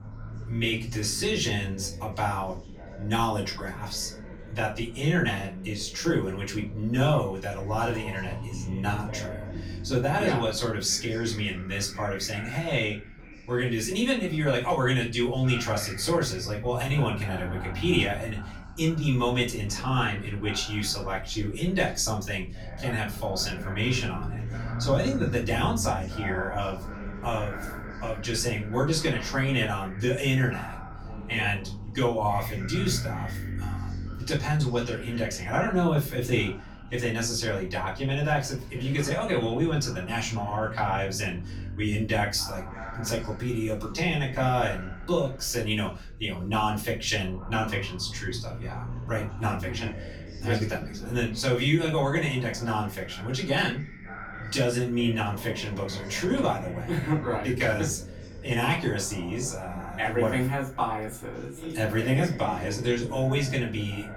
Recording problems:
off-mic speech; far
room echo; very slight; dies away in 0.3 s
background chatter; noticeable; throughout; 2 voices, 15 dB below the speech
low rumble; faint; throughout; 25 dB below the speech

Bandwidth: 17.5 kHz